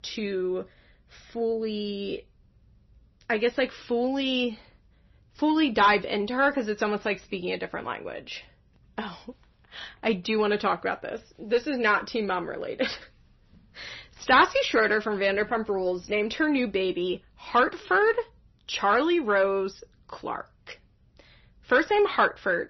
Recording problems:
distortion; slight; 10 dB below the speech
garbled, watery; slightly; nothing above 6 kHz

